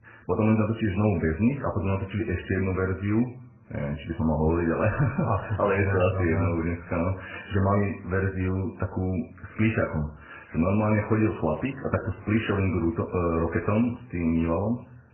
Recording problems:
garbled, watery; badly; nothing above 3 kHz
room echo; slight; dies away in 0.6 s
off-mic speech; somewhat distant

